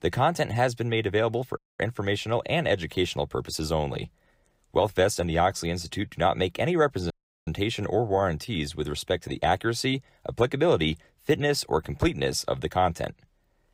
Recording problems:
audio cutting out; at 1.5 s and at 7 s

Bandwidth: 15.5 kHz